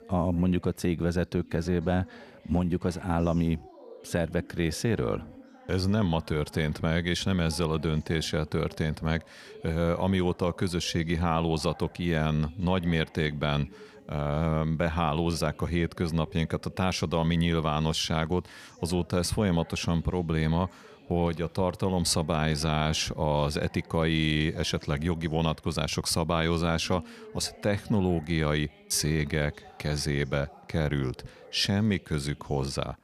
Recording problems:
voice in the background; faint; throughout; 25 dB below the speech

